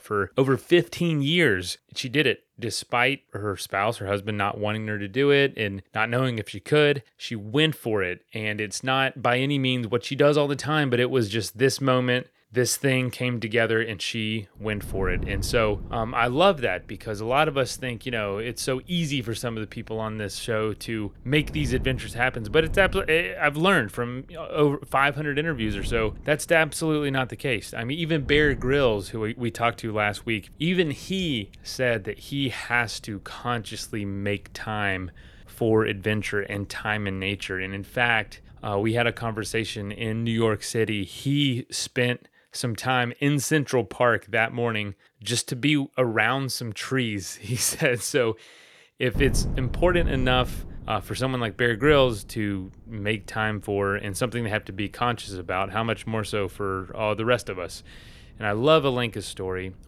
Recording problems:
wind noise on the microphone; occasional gusts; from 15 to 41 s and from 49 s on; 25 dB below the speech

